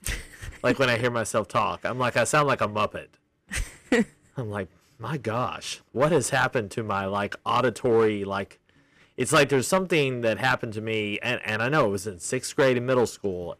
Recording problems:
distortion; slight; 2% of the sound clipped

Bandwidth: 15 kHz